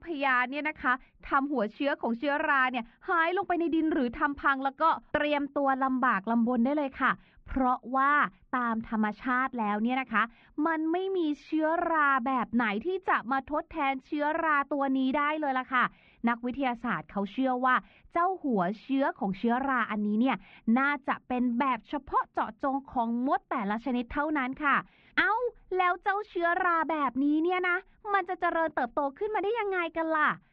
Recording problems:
muffled; very; fading above 2.5 kHz

